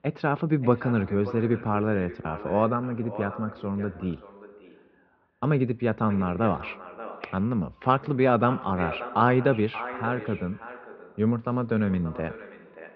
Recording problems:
muffled; very; fading above 2.5 kHz
echo of what is said; noticeable; throughout; 580 ms later, 15 dB below the speech

